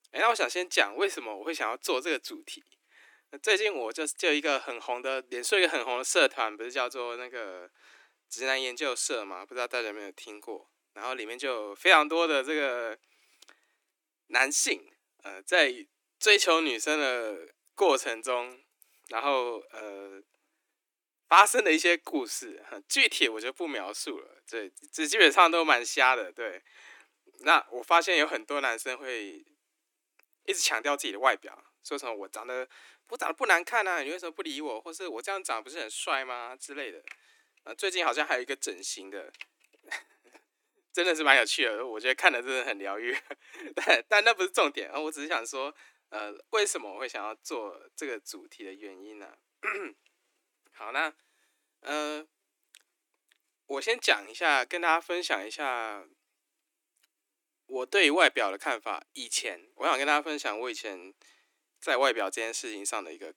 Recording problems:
thin; somewhat; fading below 300 Hz

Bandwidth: 18 kHz